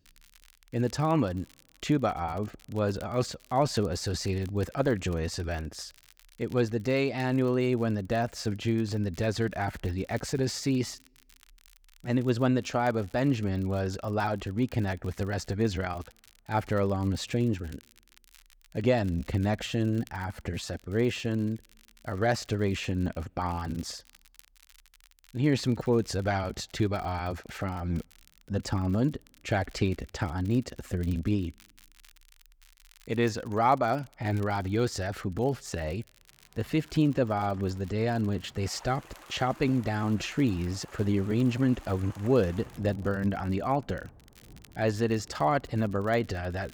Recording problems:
rain or running water; faint; from 37 s on; 25 dB below the speech
crackle, like an old record; faint; 30 dB below the speech

